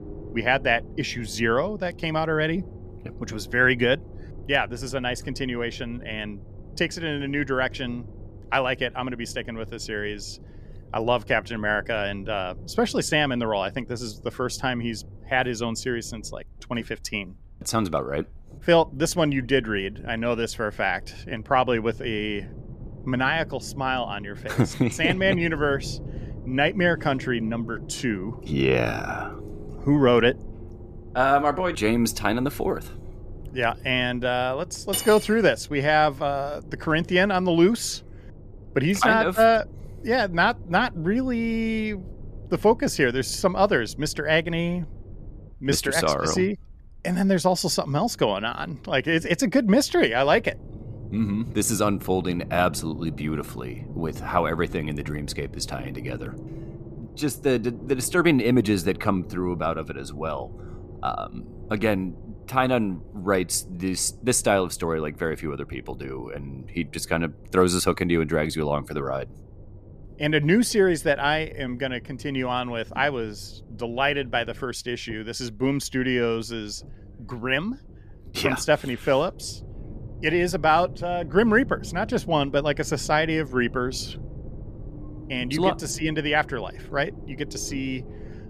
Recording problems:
low rumble; faint; throughout; 25 dB below the speech
clattering dishes; noticeable; at 35 s; peak 4 dB below the speech

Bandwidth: 14.5 kHz